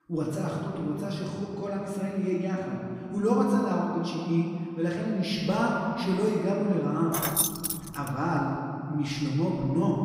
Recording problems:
off-mic speech; far
room echo; noticeable; dies away in 2.5 s
jangling keys; loud; at 7 s; peak 4 dB above the speech

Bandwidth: 15.5 kHz